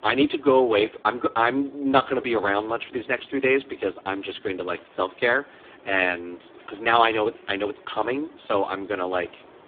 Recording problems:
phone-call audio; poor line
traffic noise; faint; throughout; 25 dB below the speech

